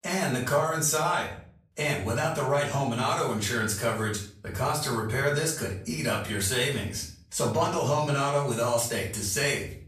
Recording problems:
off-mic speech; far
room echo; slight; dies away in 0.4 s

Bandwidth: 14.5 kHz